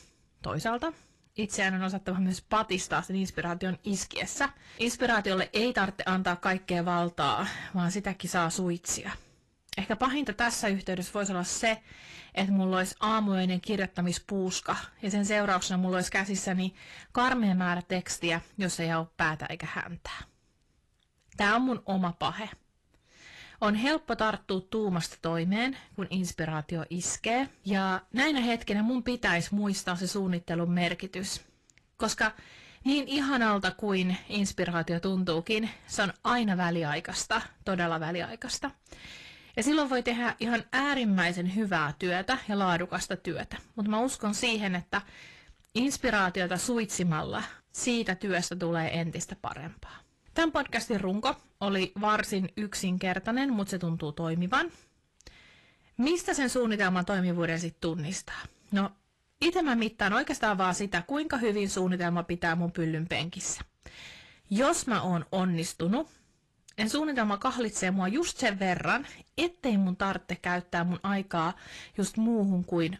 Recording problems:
distortion; slight; 10 dB below the speech
garbled, watery; slightly; nothing above 12.5 kHz

